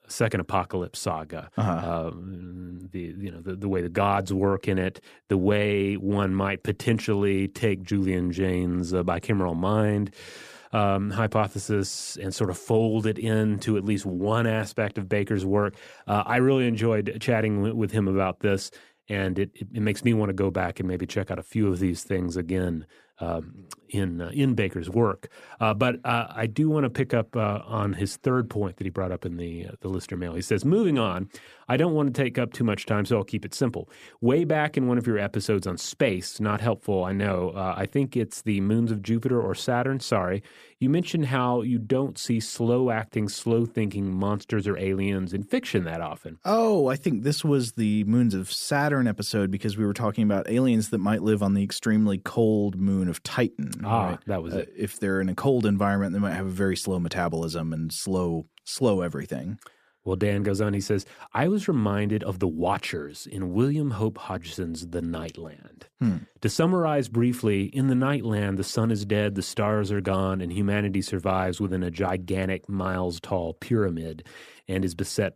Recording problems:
none

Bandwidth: 14.5 kHz